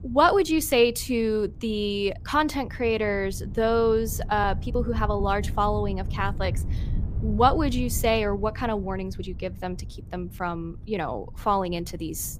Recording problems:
low rumble; faint; throughout; 25 dB below the speech
uneven, jittery; slightly; from 2 to 11 s

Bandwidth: 15 kHz